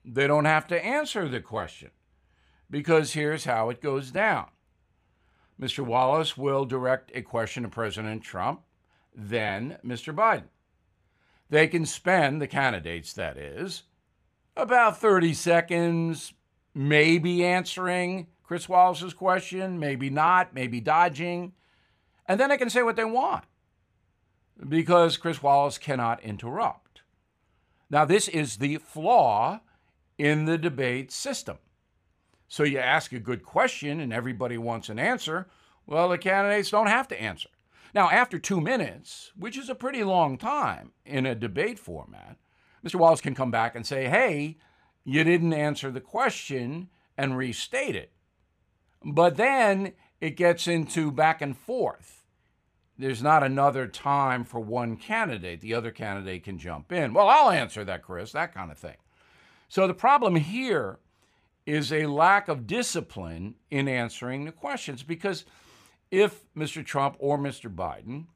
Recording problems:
uneven, jittery; strongly; from 15 s to 1:05

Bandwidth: 15 kHz